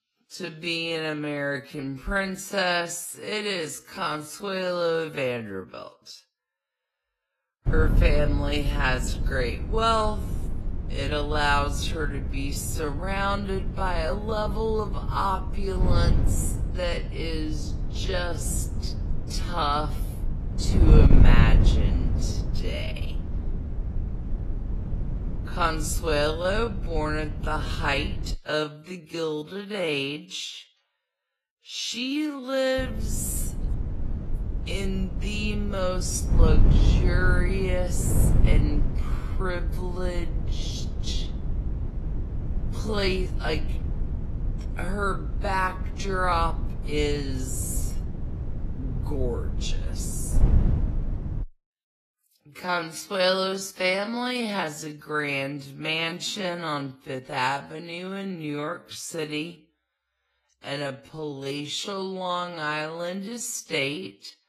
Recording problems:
wrong speed, natural pitch; too slow; 0.5 times normal speed
garbled, watery; slightly; nothing above 12.5 kHz
wind noise on the microphone; occasional gusts; from 7.5 to 28 s and from 33 to 51 s; 10 dB below the speech

